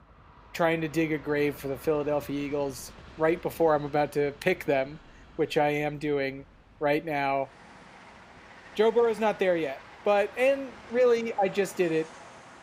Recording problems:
train or aircraft noise; faint; throughout; 20 dB below the speech

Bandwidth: 15.5 kHz